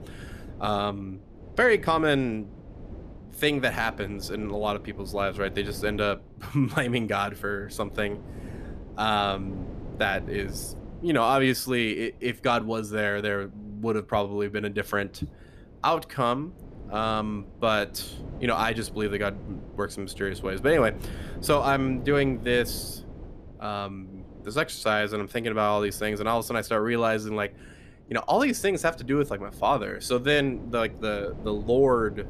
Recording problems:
wind noise on the microphone; occasional gusts; 20 dB below the speech

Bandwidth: 14.5 kHz